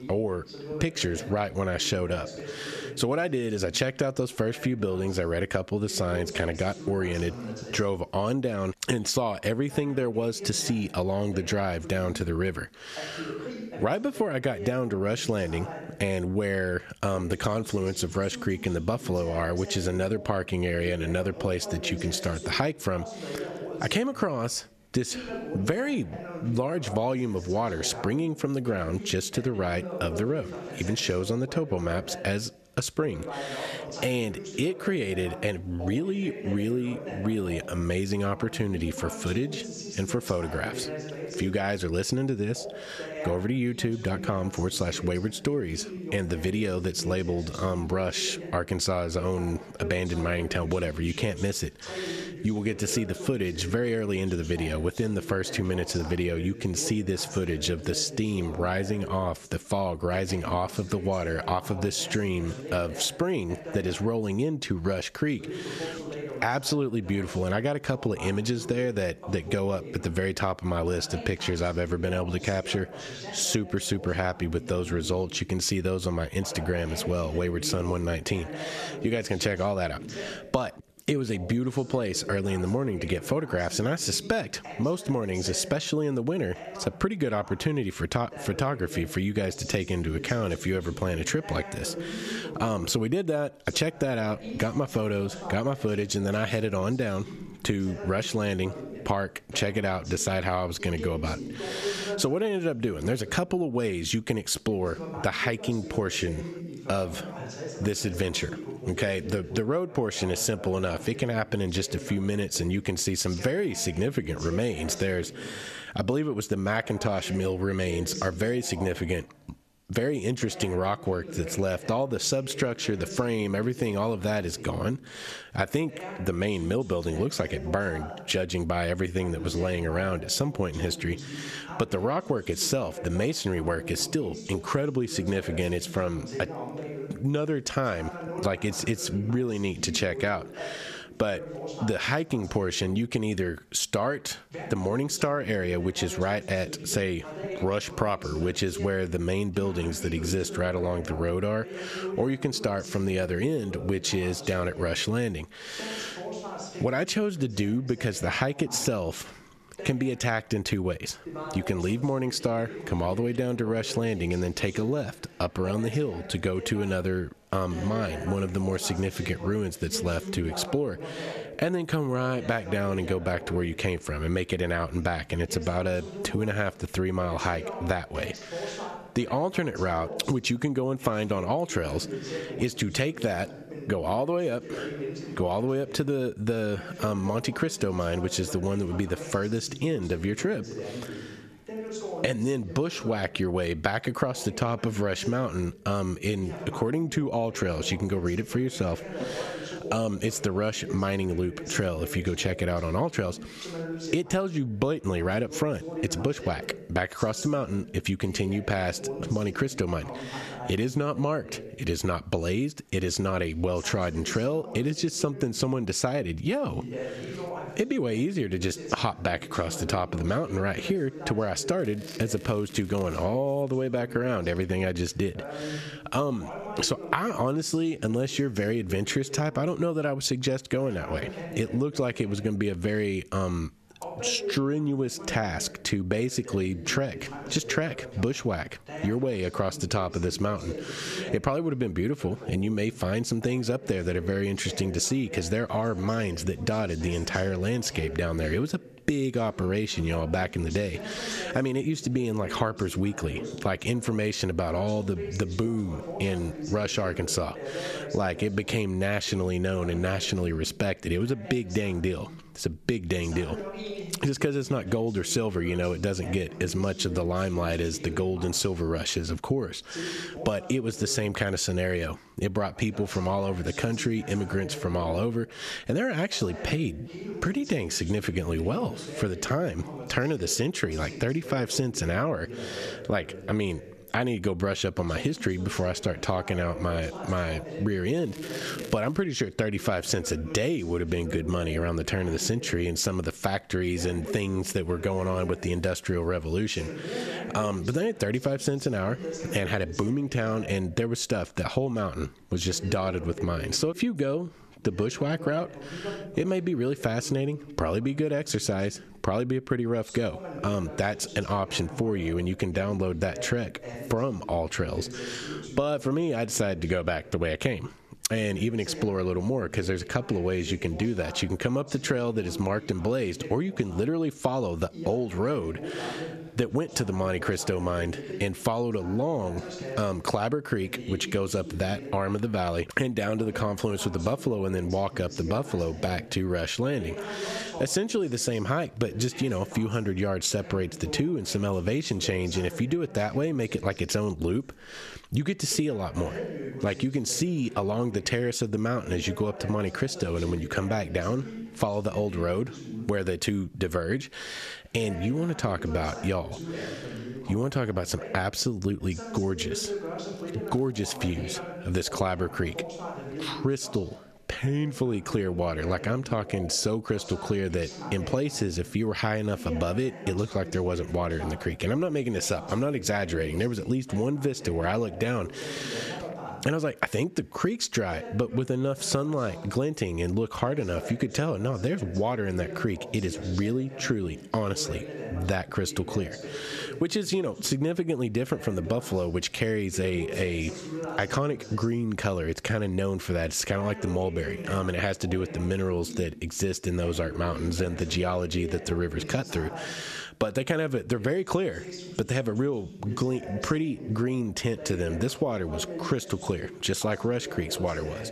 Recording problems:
squashed, flat; somewhat, background pumping
voice in the background; noticeable; throughout; 10 dB below the speech
crackling; noticeable; from 3:42 to 3:43, from 4:48 to 4:49 and at 6:01; 20 dB below the speech

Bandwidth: 14 kHz